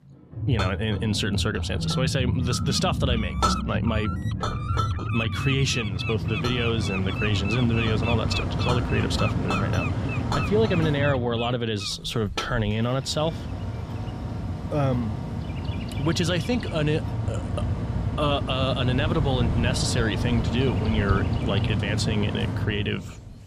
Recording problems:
animal sounds; loud; throughout; 9 dB below the speech
household noises; loud; throughout; 9 dB below the speech
background music; loud; throughout; 5 dB below the speech
machinery noise; loud; from 6 s on; 2 dB below the speech

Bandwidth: 14.5 kHz